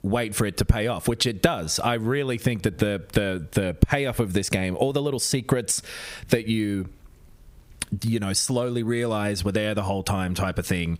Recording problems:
squashed, flat; somewhat

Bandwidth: 15.5 kHz